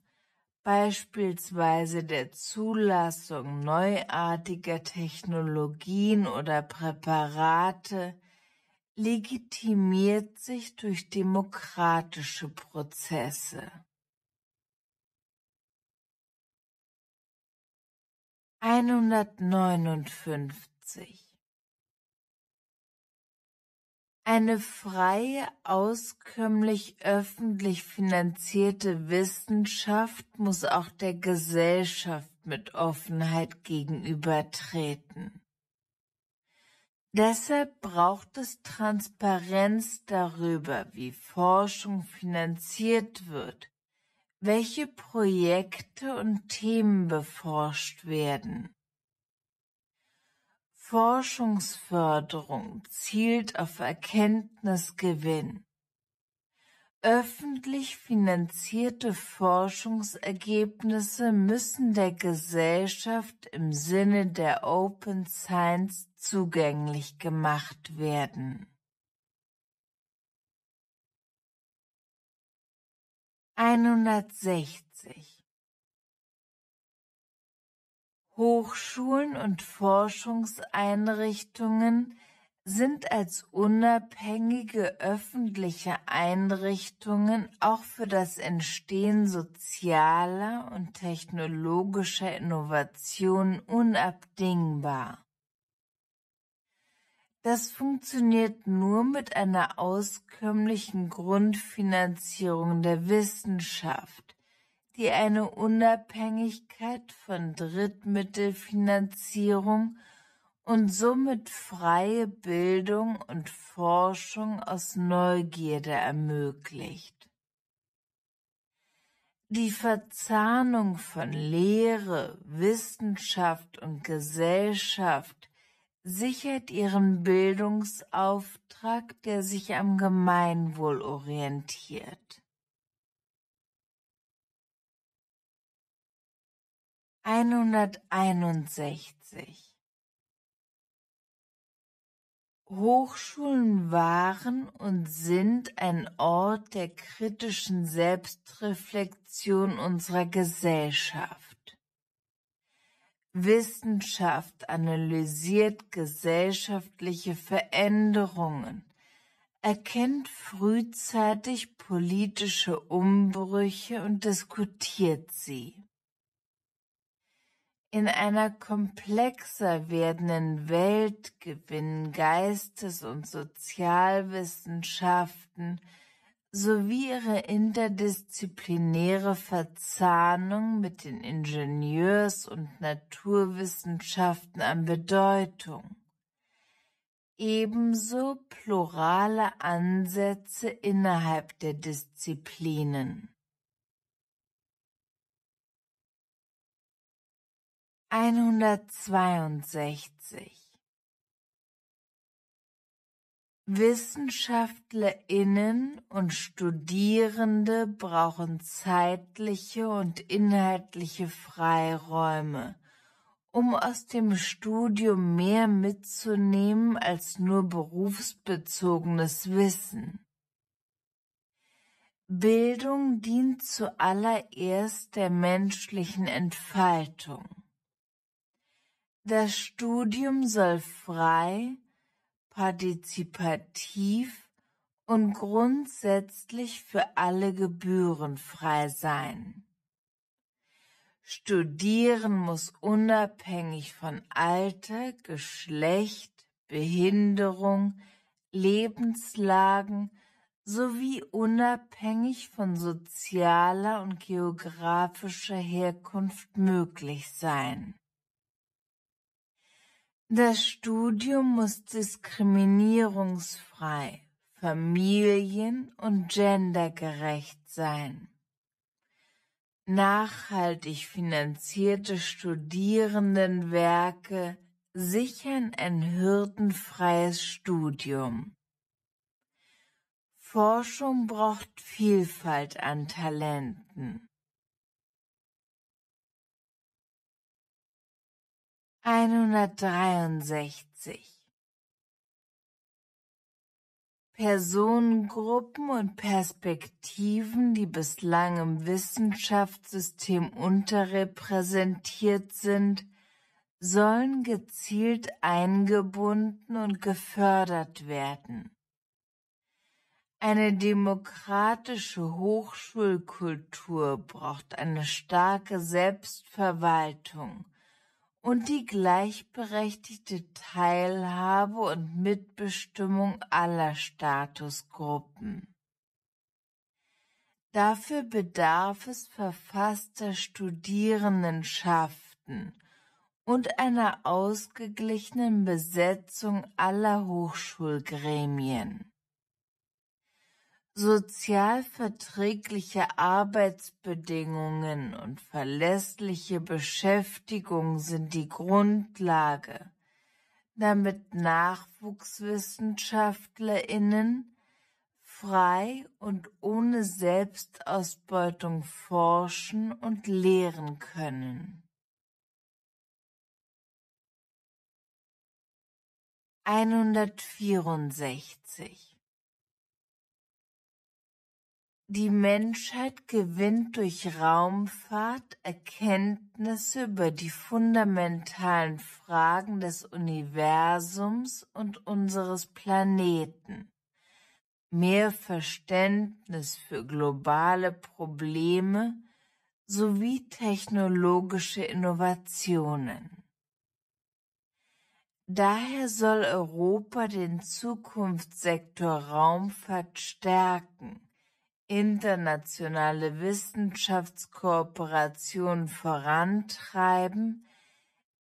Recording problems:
wrong speed, natural pitch; too slow; 0.5 times normal speed

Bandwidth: 14.5 kHz